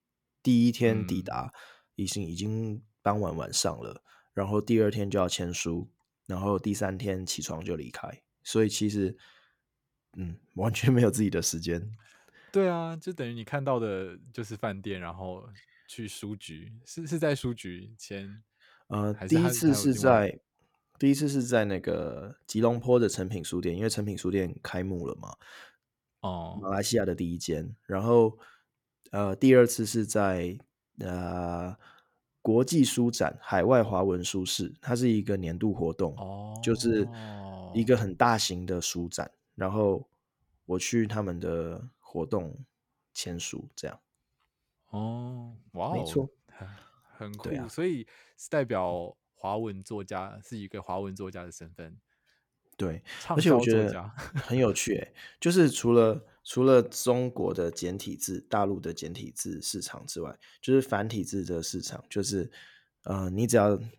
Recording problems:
none

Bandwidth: 18 kHz